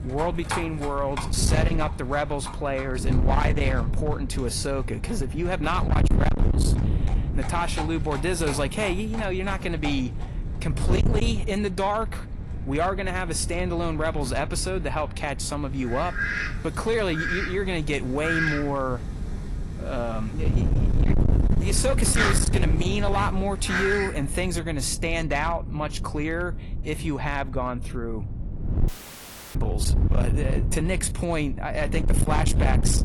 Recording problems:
distortion; slight; 10% of the sound clipped
garbled, watery; slightly; nothing above 11 kHz
wind noise on the microphone; heavy; 10 dB below the speech
animal sounds; loud; until 24 s; 6 dB below the speech
audio cutting out; filled with static; at 29 s for 0.5 s

